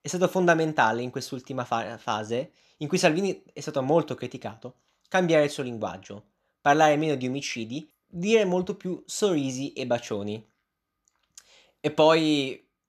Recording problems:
none

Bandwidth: 13.5 kHz